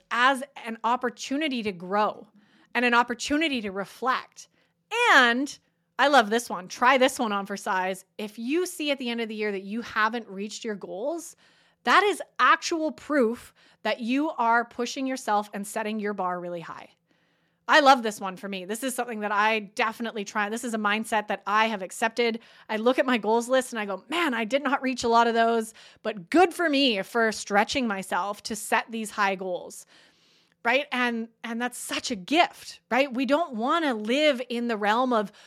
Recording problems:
none

